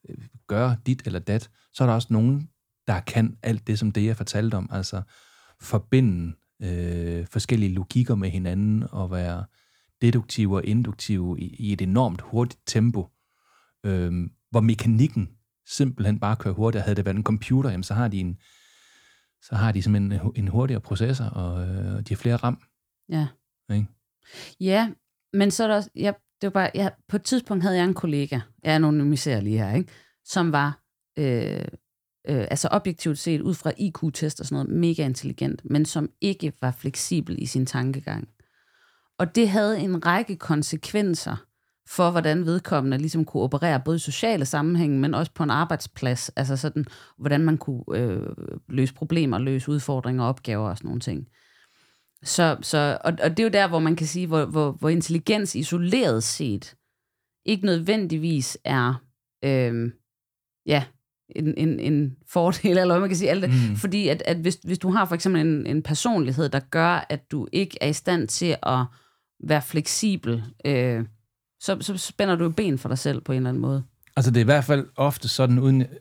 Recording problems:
none

